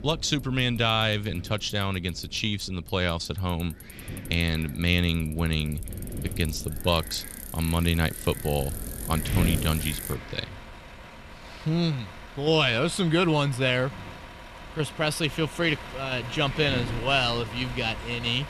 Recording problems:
traffic noise; noticeable; throughout; 15 dB below the speech
wind noise on the microphone; occasional gusts; 15 dB below the speech

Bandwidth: 14.5 kHz